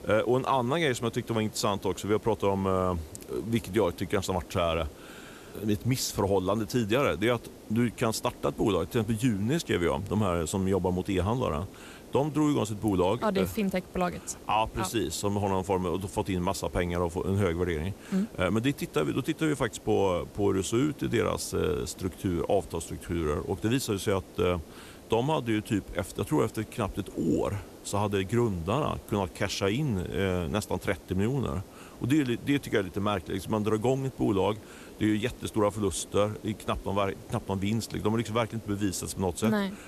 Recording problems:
hiss; noticeable; throughout; 20 dB below the speech

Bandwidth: 14 kHz